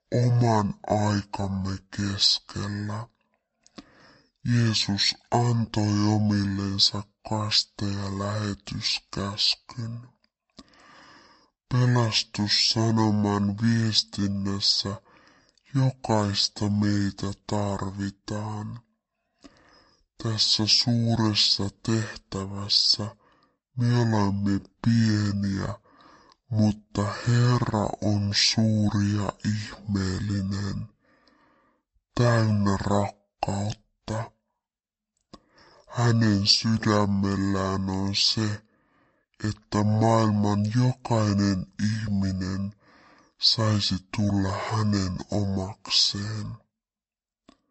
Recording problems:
wrong speed and pitch; too slow and too low; 0.5 times normal speed

